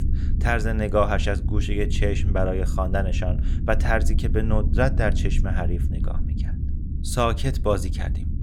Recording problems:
low rumble; noticeable; throughout; 15 dB below the speech

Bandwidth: 18 kHz